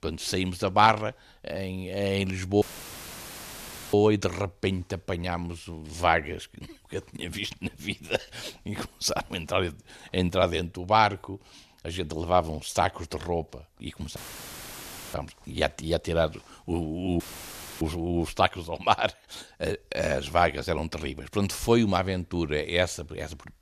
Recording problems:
audio cutting out; filled with static; at 2.5 s for 1.5 s, at 14 s for 1 s and at 17 s for 0.5 s

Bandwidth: 14 kHz